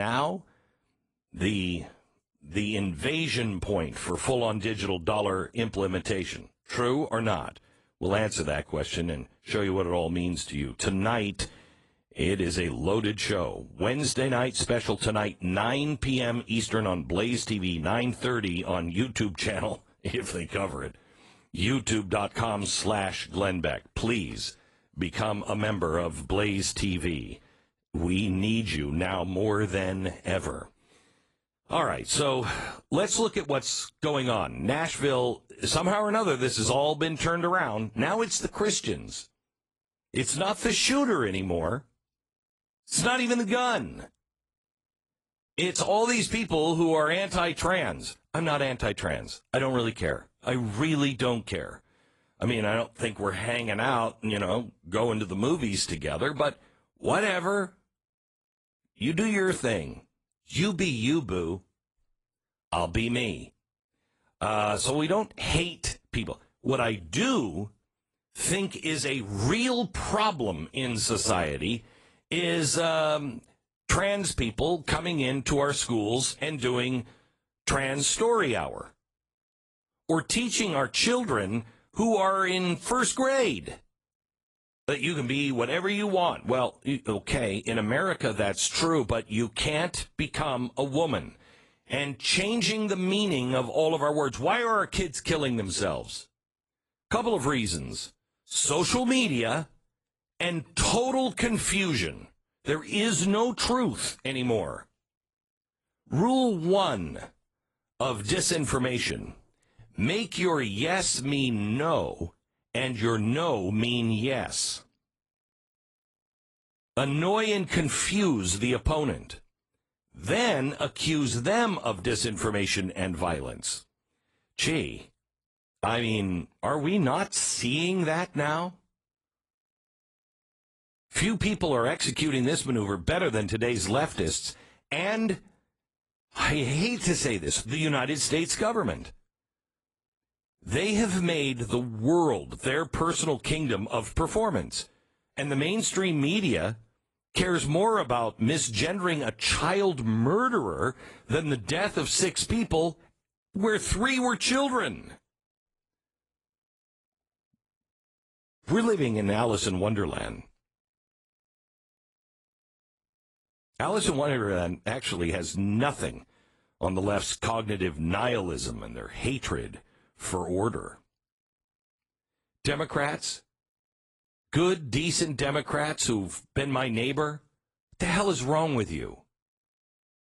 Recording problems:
garbled, watery; slightly
abrupt cut into speech; at the start

